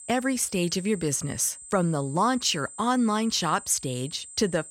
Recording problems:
high-pitched whine; noticeable; throughout; 8 kHz, 15 dB below the speech

